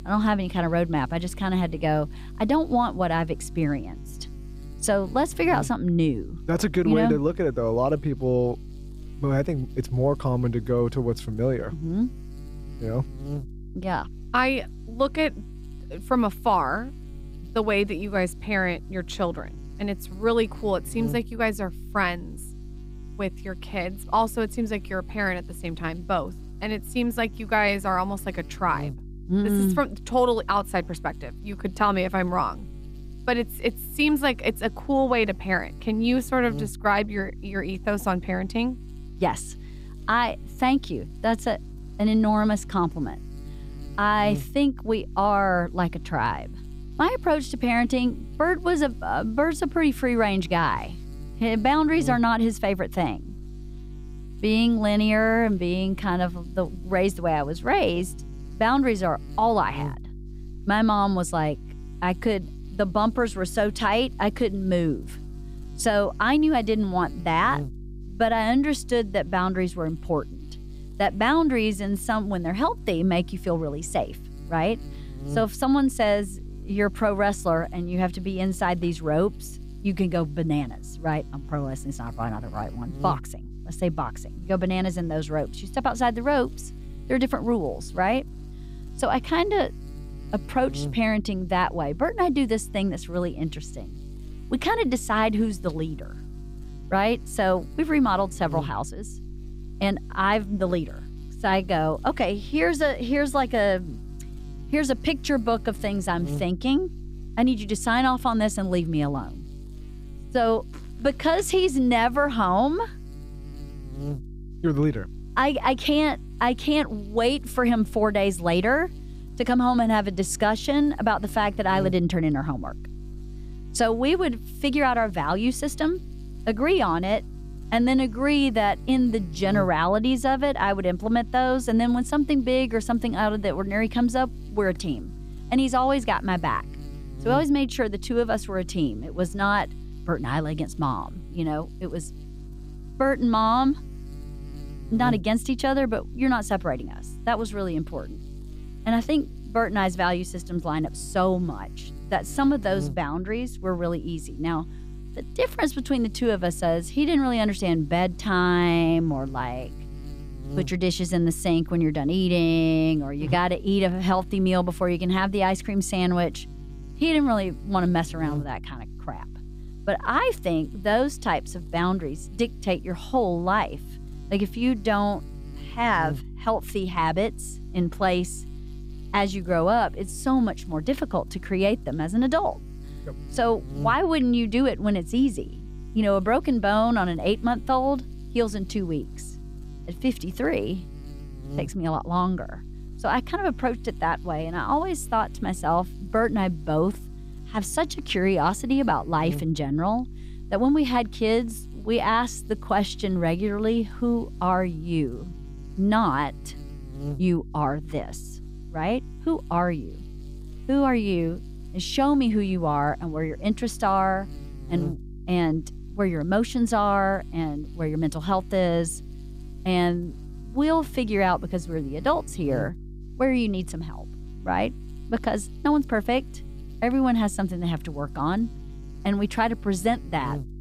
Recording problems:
electrical hum; faint; throughout; 50 Hz, 25 dB below the speech

